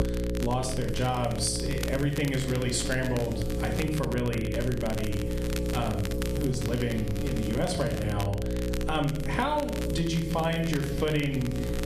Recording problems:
room echo; slight; dies away in 0.5 s
off-mic speech; somewhat distant
squashed, flat; somewhat
electrical hum; loud; throughout; 60 Hz, 7 dB below the speech
crackle, like an old record; noticeable; 15 dB below the speech

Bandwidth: 14.5 kHz